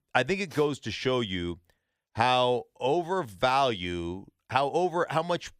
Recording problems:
none

